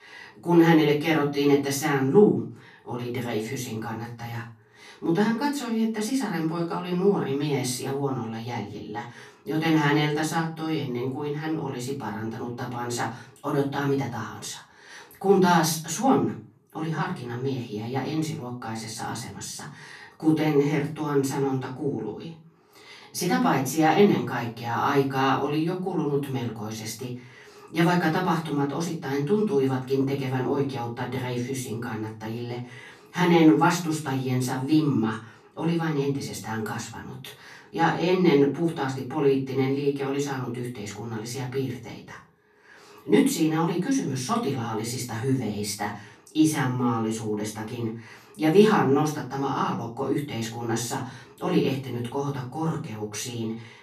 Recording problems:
off-mic speech; far
room echo; slight; dies away in 0.3 s

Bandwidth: 14 kHz